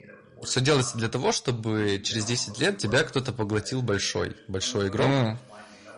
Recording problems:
distortion; slight; 3% of the sound clipped
garbled, watery; slightly; nothing above 10.5 kHz
voice in the background; faint; throughout; 20 dB below the speech

